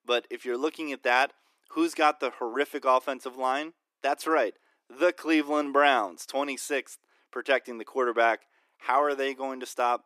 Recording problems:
thin; somewhat; fading below 300 Hz

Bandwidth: 14.5 kHz